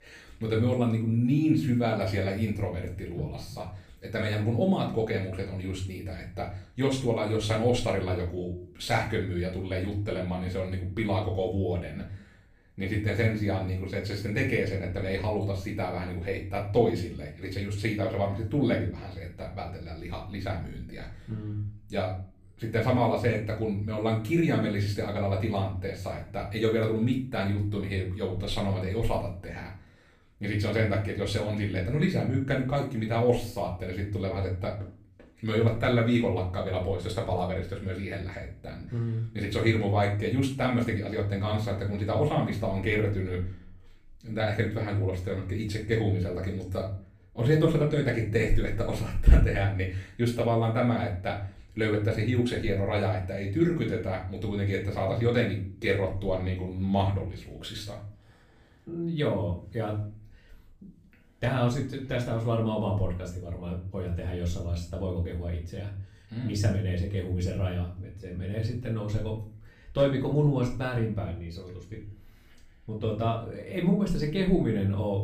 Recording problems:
off-mic speech; far
room echo; slight; dies away in 0.4 s

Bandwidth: 15 kHz